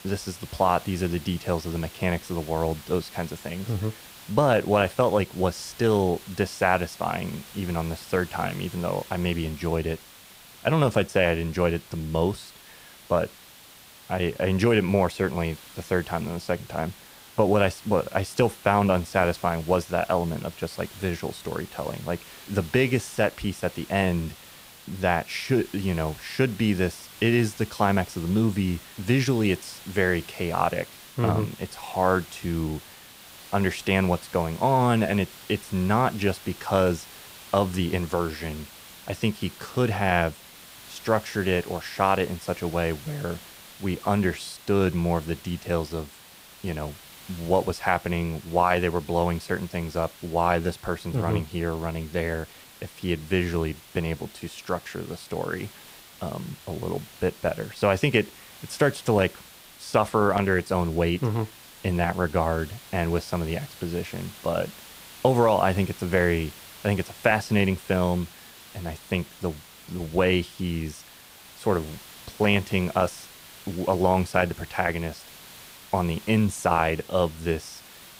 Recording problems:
hiss; noticeable; throughout; 20 dB below the speech

